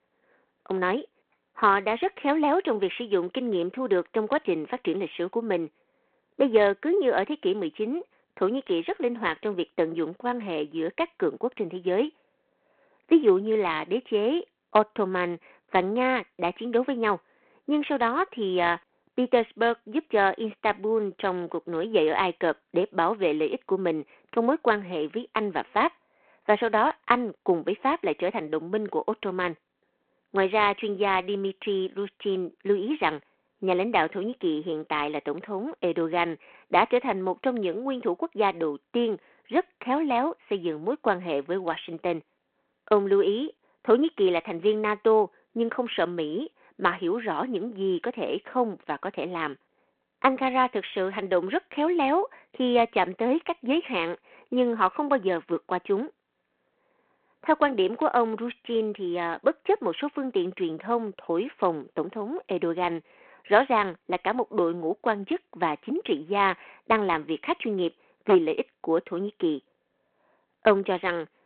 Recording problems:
phone-call audio

